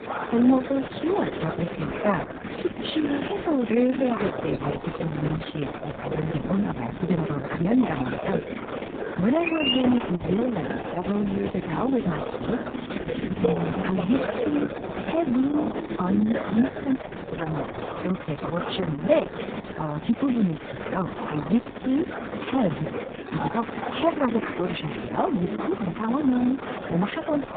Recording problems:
garbled, watery; badly; nothing above 3.5 kHz
high frequencies cut off; slight
murmuring crowd; loud; throughout; 6 dB below the speech

